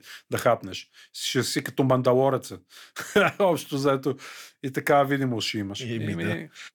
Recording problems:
none

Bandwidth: 18.5 kHz